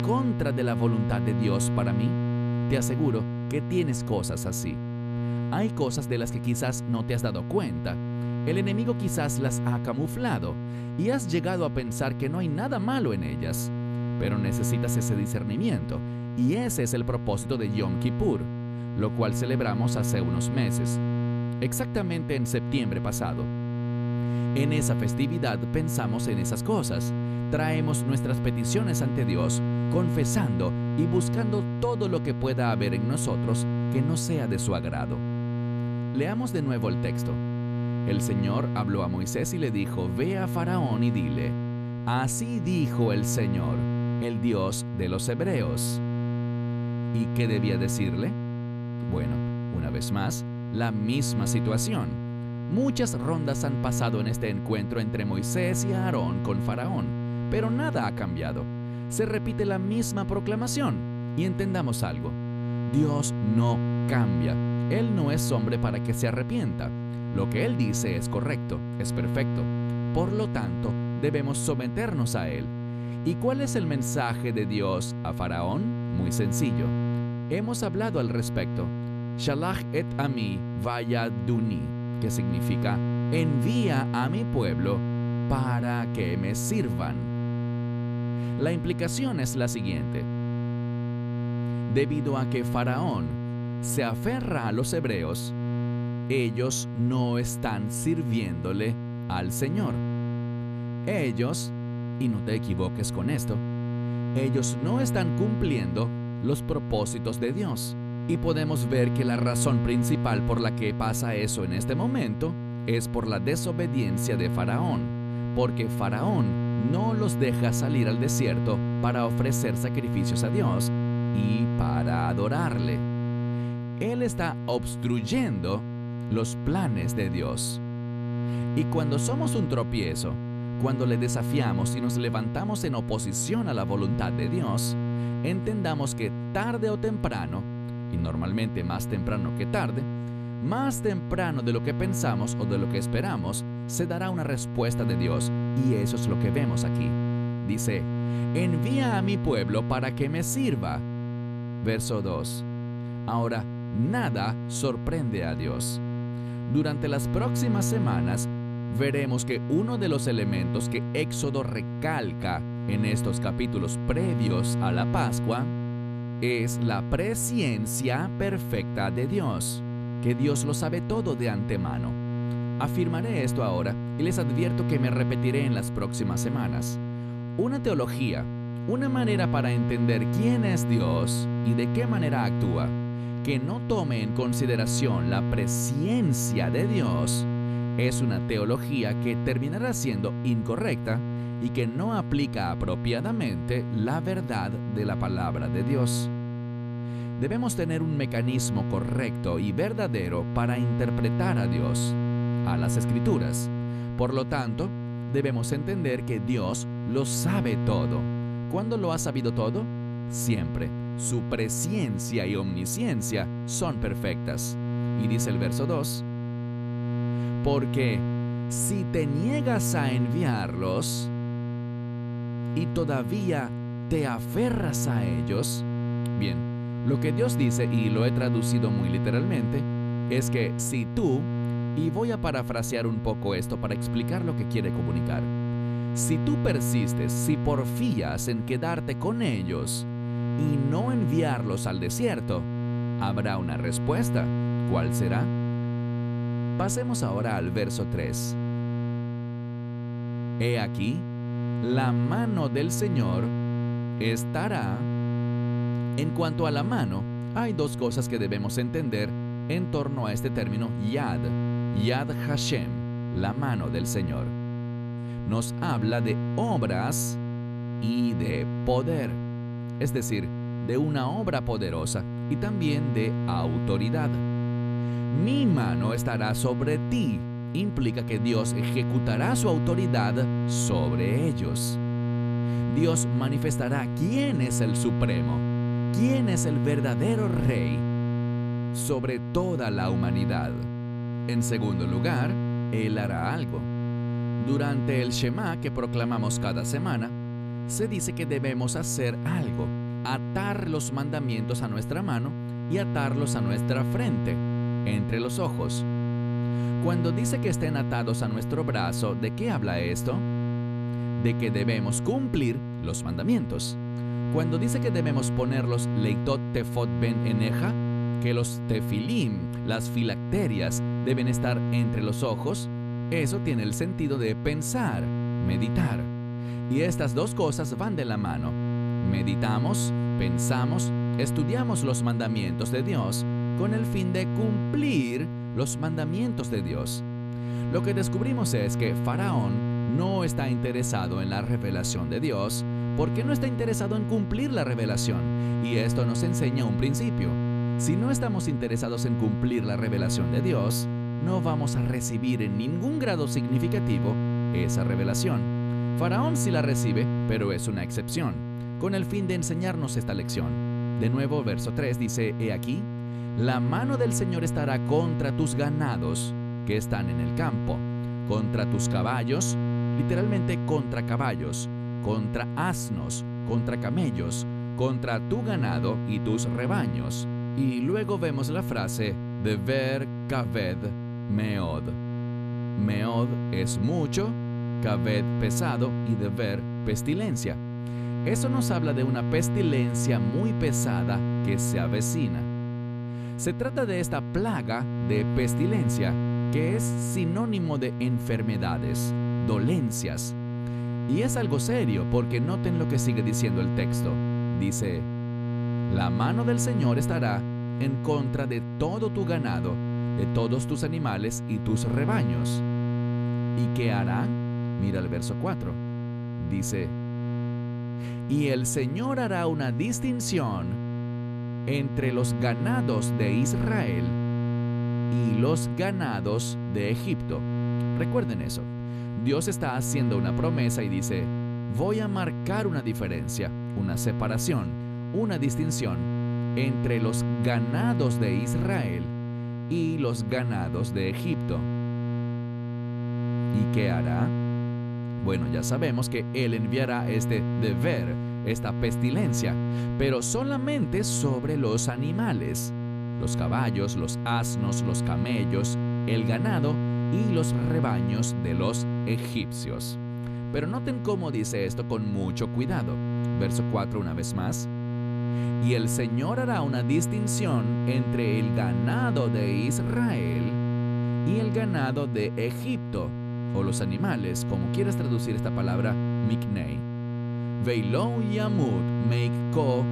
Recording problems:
electrical hum; loud; throughout; 60 Hz, 5 dB below the speech

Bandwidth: 14 kHz